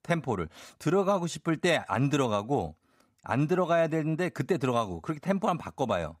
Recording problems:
none

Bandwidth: 15.5 kHz